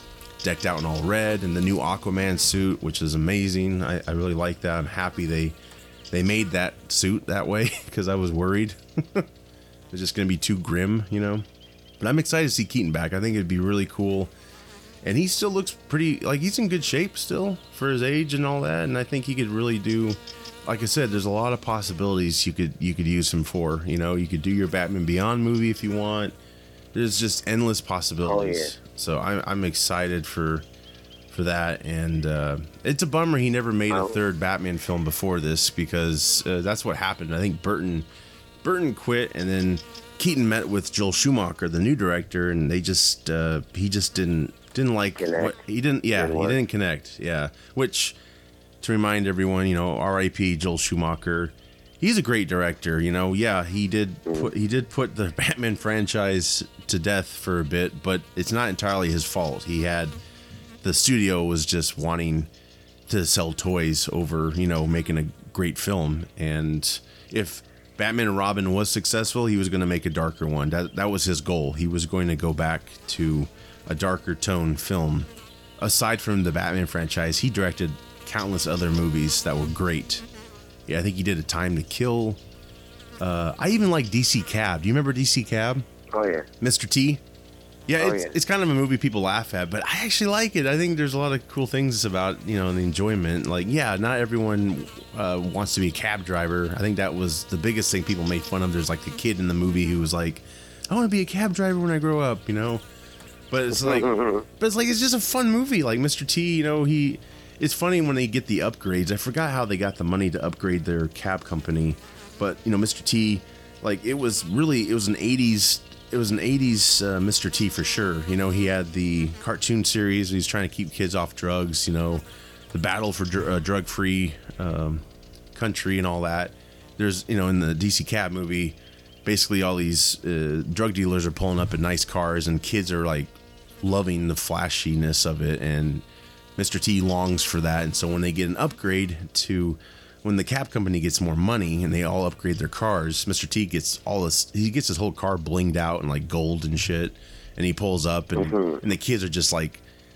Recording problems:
electrical hum; faint; throughout; 60 Hz, 20 dB below the speech

